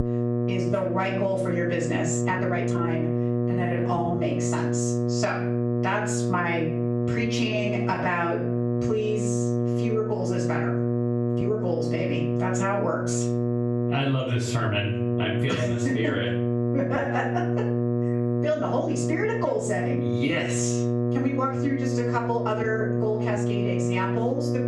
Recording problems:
off-mic speech; far
room echo; slight; dies away in 0.4 s
squashed, flat; somewhat
electrical hum; loud; throughout; 60 Hz, 3 dB below the speech
uneven, jittery; strongly; from 2 to 24 s

